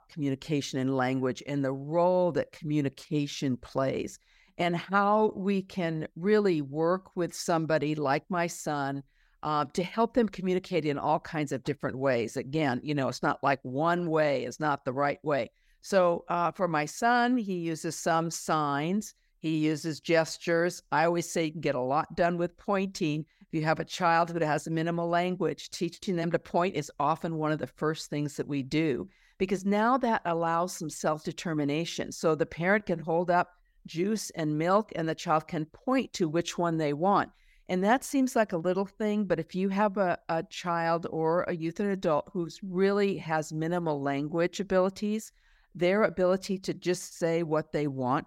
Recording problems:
none

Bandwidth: 16 kHz